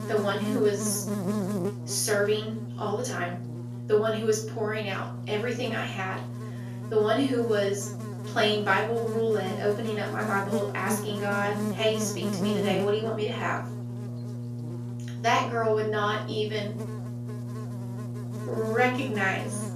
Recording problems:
off-mic speech; far
room echo; slight; dies away in 0.4 s
electrical hum; noticeable; throughout; 60 Hz, 10 dB below the speech

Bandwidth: 14.5 kHz